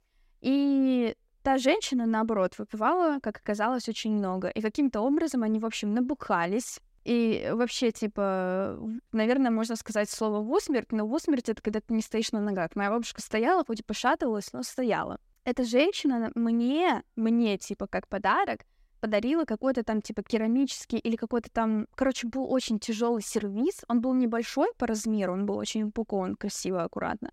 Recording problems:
none

